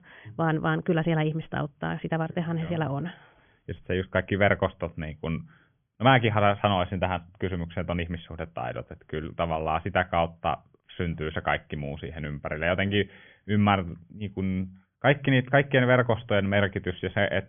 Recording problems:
high frequencies cut off; severe; nothing above 3.5 kHz

